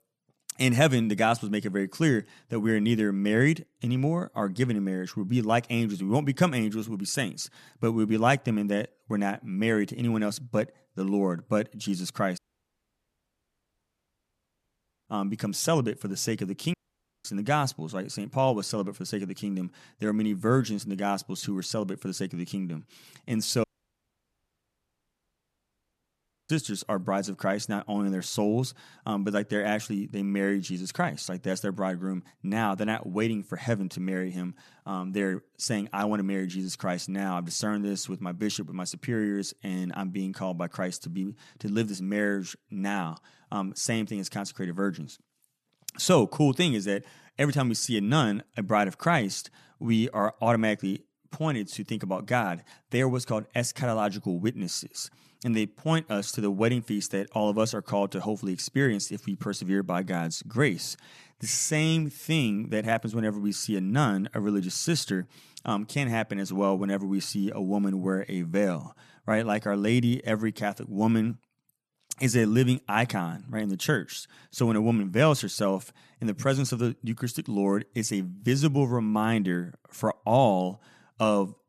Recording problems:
audio cutting out; at 12 s for 2.5 s, at 17 s for 0.5 s and at 24 s for 3 s

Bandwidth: 13.5 kHz